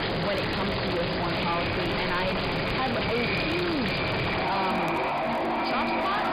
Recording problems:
distortion; heavy; 6 dB below the speech
echo of what is said; strong; throughout; 510 ms later, 8 dB below the speech
high frequencies cut off; severe; nothing above 5 kHz
household noises; very loud; throughout; 2 dB above the speech
crackle, like an old record; faint; 30 dB below the speech

